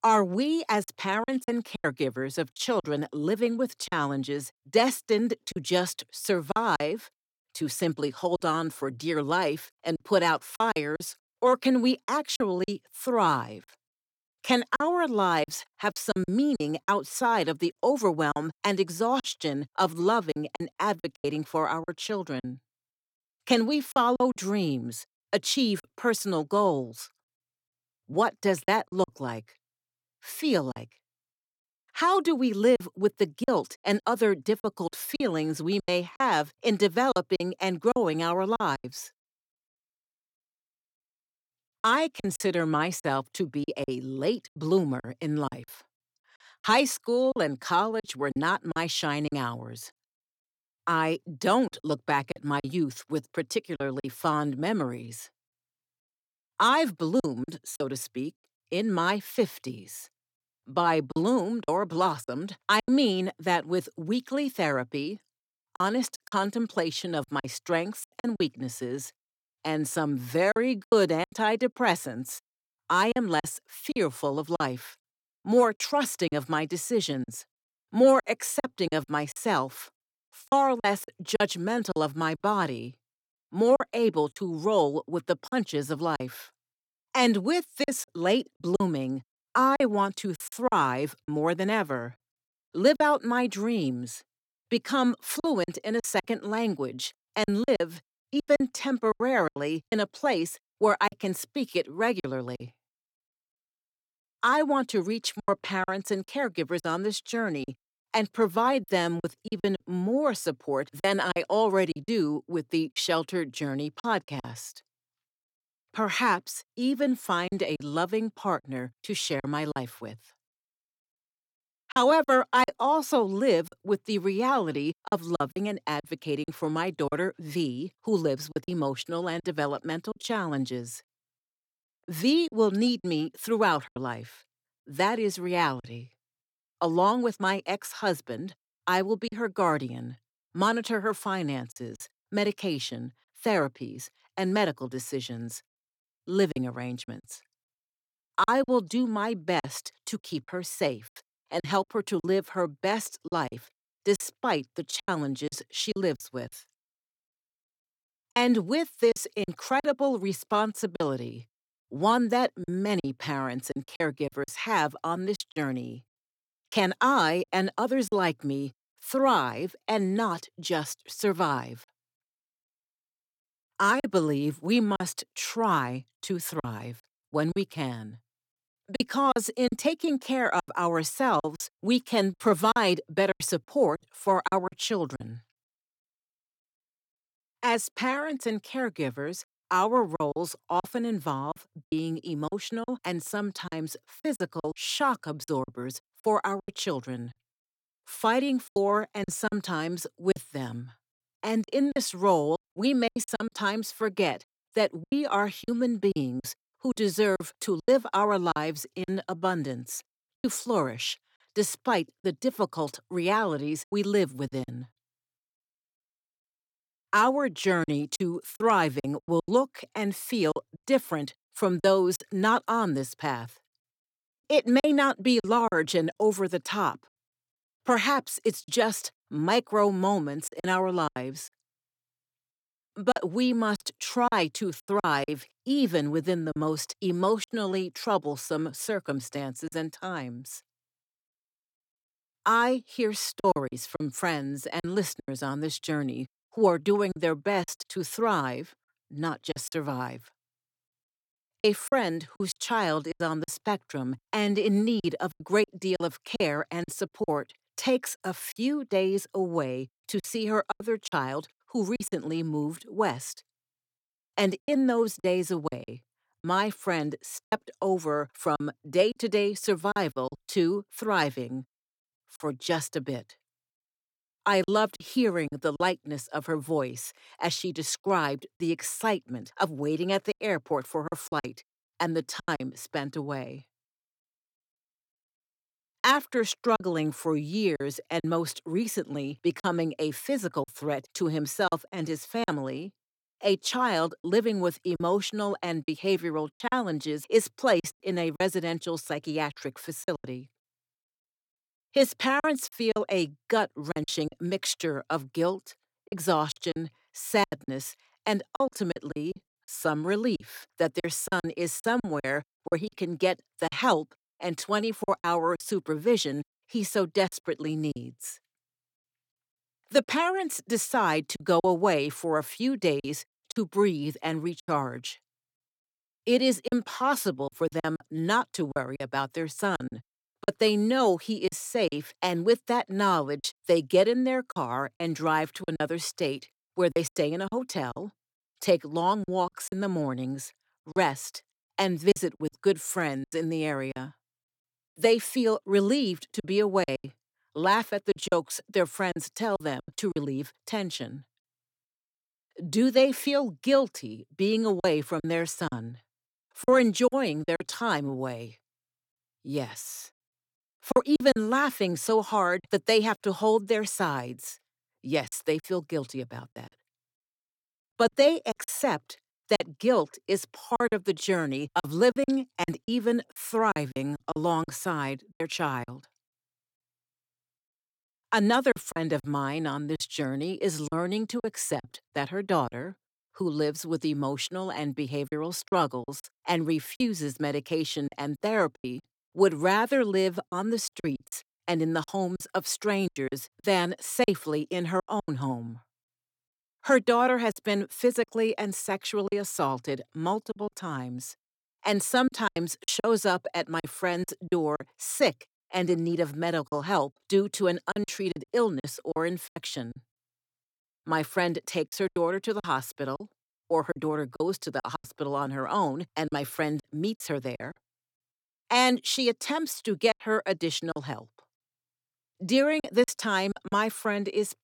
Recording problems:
choppy; very; 7% of the speech affected

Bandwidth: 17.5 kHz